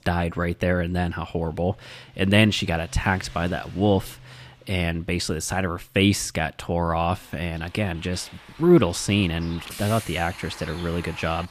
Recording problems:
traffic noise; noticeable; throughout; 20 dB below the speech

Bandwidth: 14.5 kHz